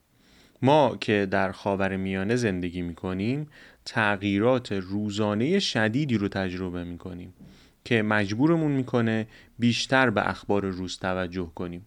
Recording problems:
none

